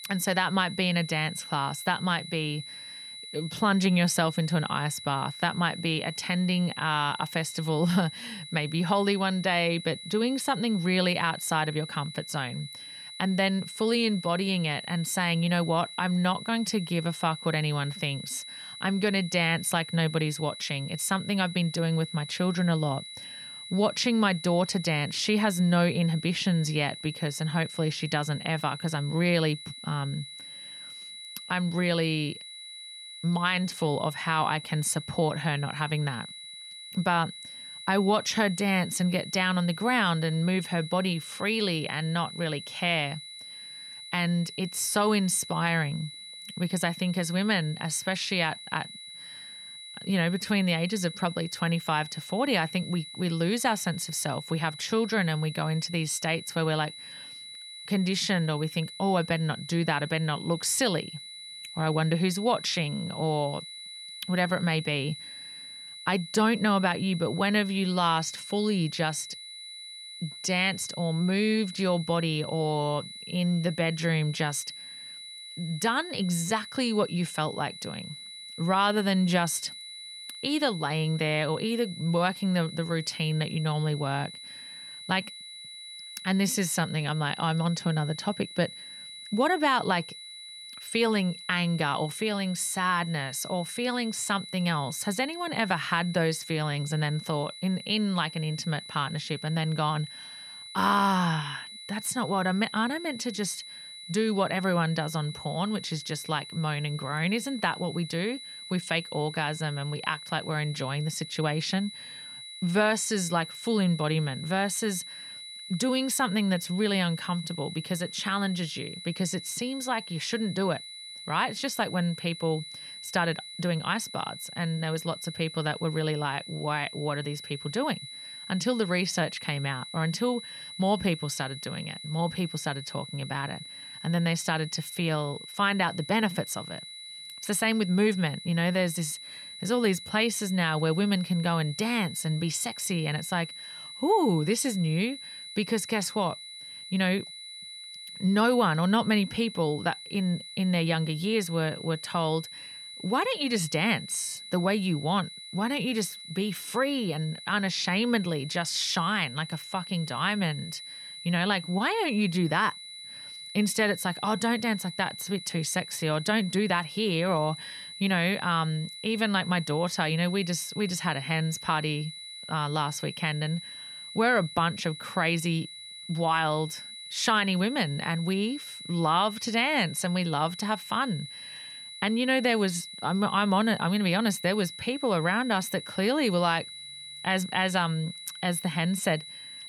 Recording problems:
high-pitched whine; noticeable; throughout; 4 kHz, 10 dB below the speech

